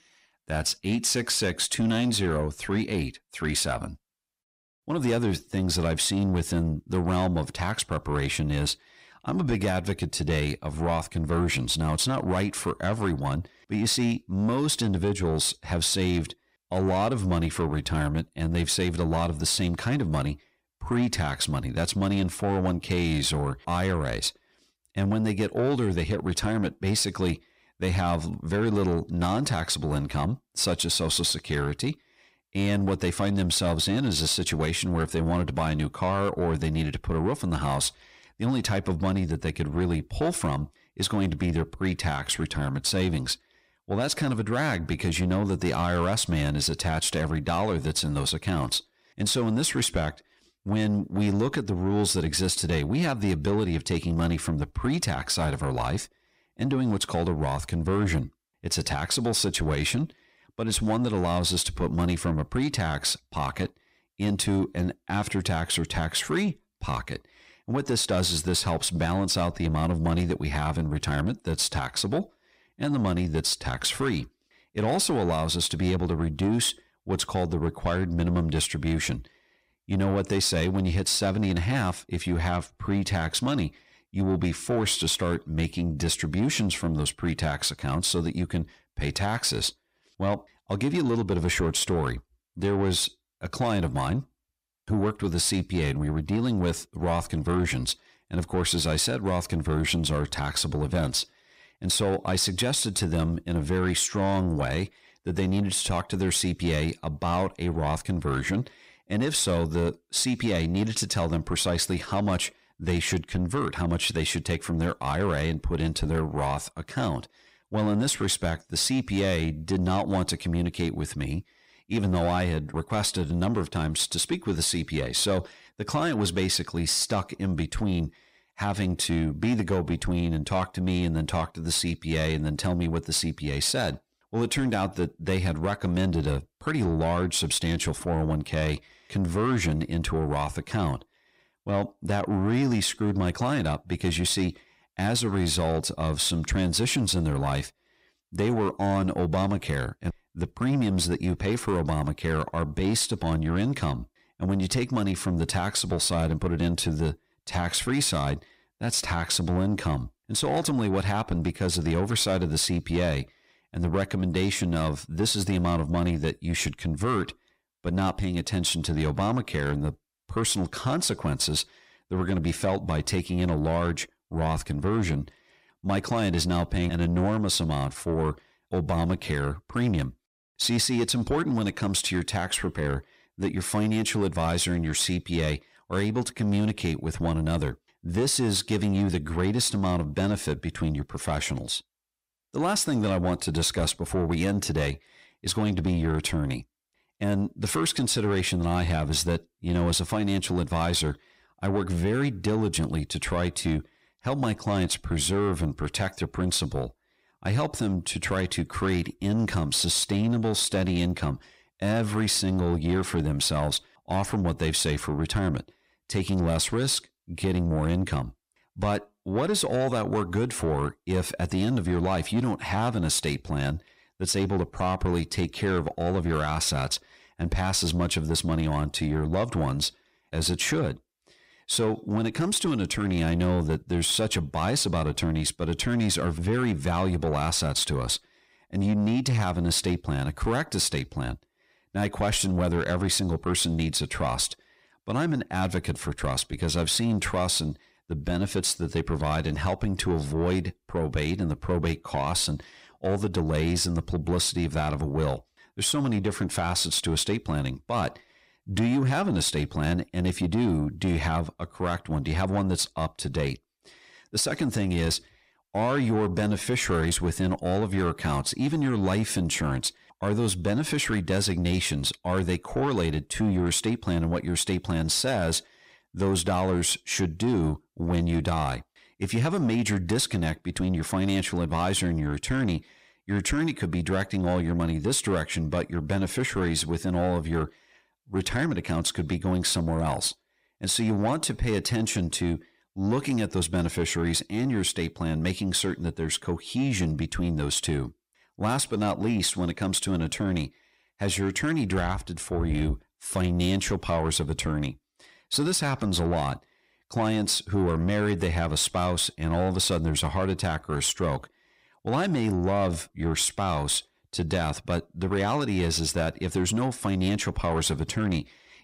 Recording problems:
distortion; slight; 10 dB below the speech

